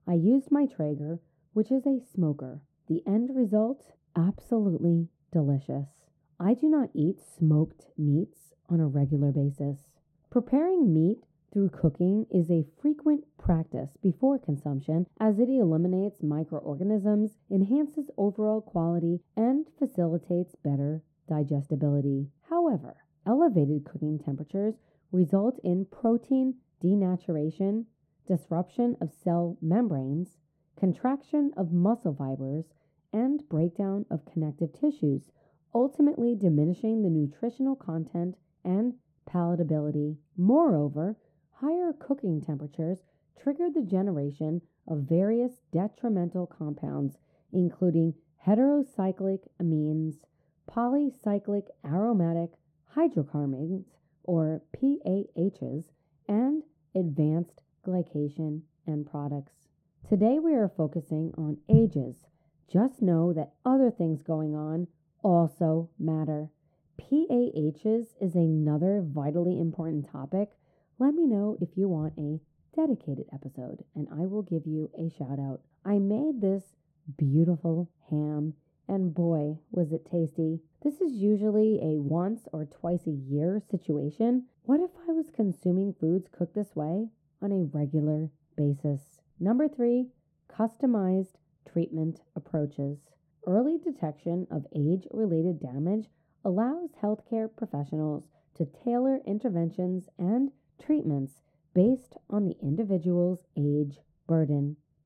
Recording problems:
muffled; very; fading above 1 kHz

